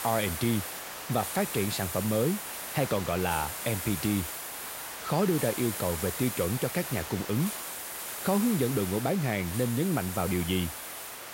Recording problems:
hiss; loud; throughout; 5 dB below the speech

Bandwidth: 16 kHz